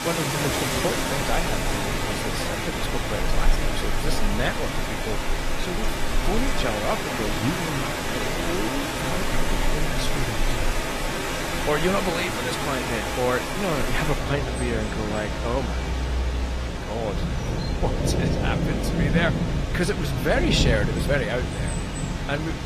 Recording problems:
garbled, watery; slightly; nothing above 14.5 kHz
rain or running water; very loud; throughout; 3 dB above the speech

